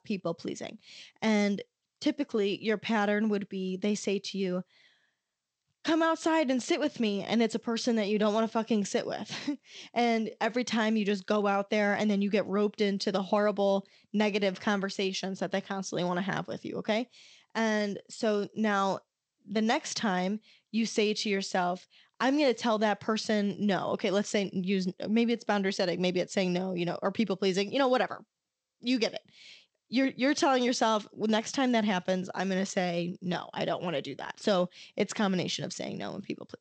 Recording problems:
garbled, watery; slightly; nothing above 8 kHz

